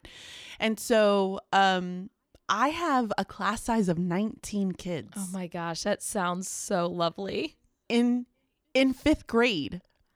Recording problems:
none

